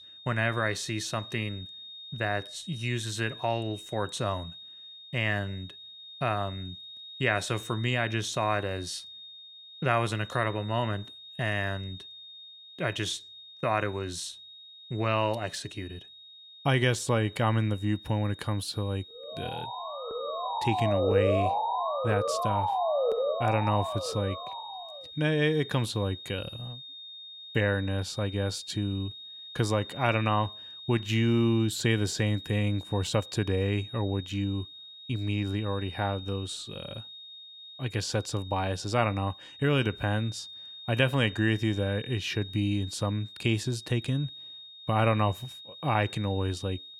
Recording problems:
high-pitched whine; noticeable; throughout; 3.5 kHz, 15 dB below the speech
siren; loud; from 19 to 25 s; peak 4 dB above the speech

